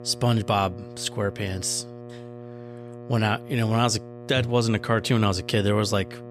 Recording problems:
electrical hum; noticeable; throughout; 60 Hz, 15 dB below the speech

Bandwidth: 14 kHz